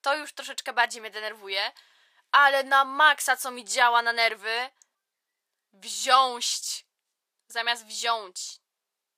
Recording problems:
thin; very; fading below 650 Hz

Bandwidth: 15 kHz